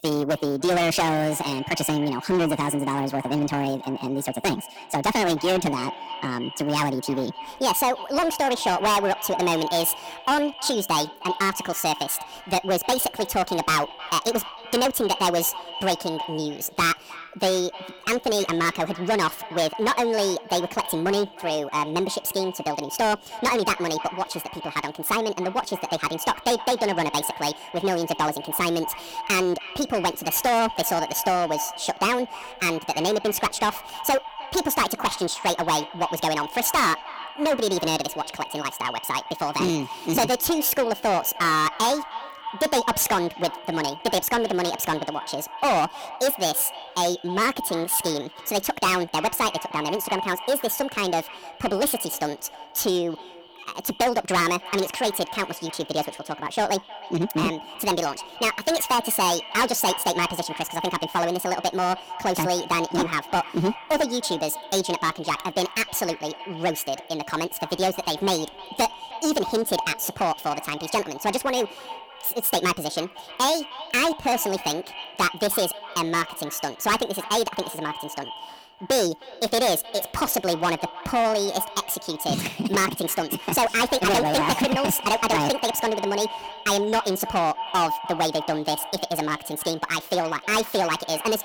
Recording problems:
distortion; heavy; 9% of the sound clipped
wrong speed and pitch; too fast and too high; 1.6 times normal speed
echo of what is said; noticeable; throughout; 310 ms later, 15 dB below the speech

